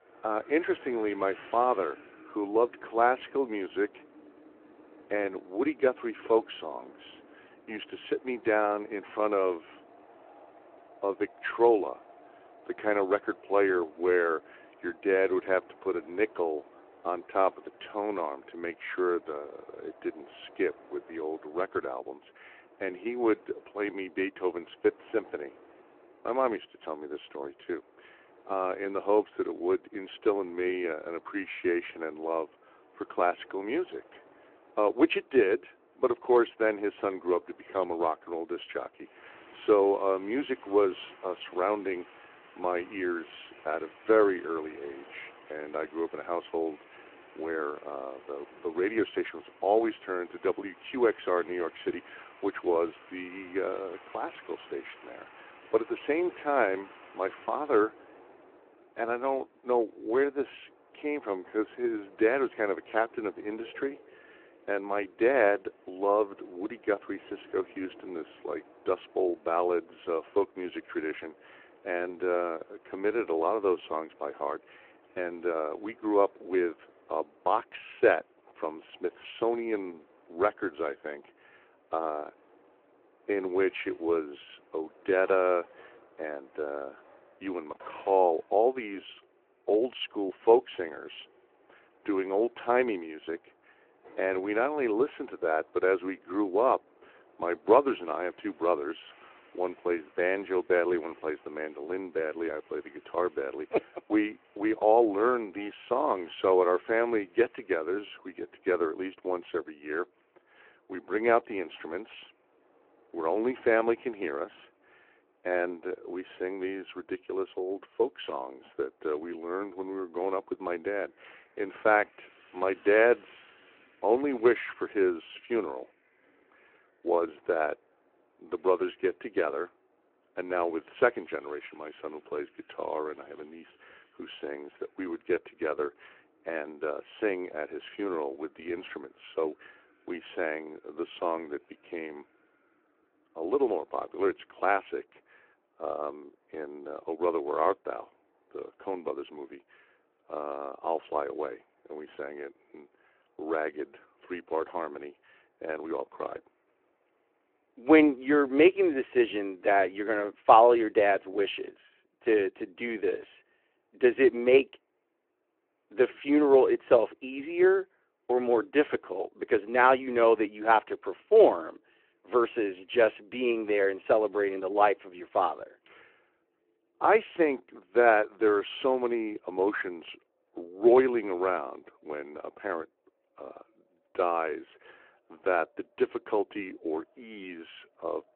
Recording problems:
phone-call audio
wind in the background; faint; throughout; 25 dB below the speech

